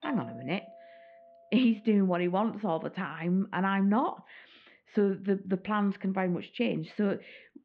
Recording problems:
muffled; very; fading above 3.5 kHz
doorbell; faint; until 1.5 s; peak 15 dB below the speech

